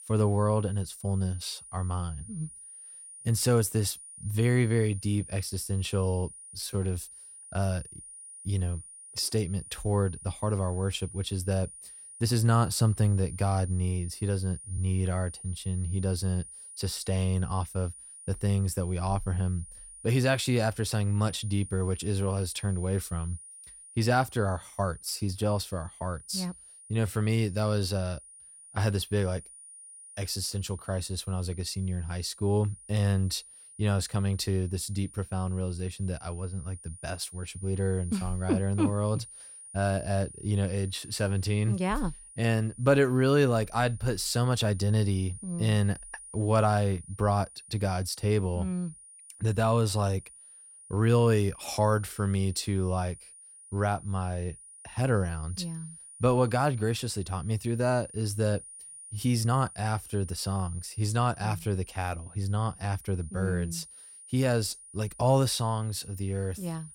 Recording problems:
high-pitched whine; noticeable; throughout; 9.5 kHz, 15 dB below the speech
uneven, jittery; slightly; from 1 s to 1:00

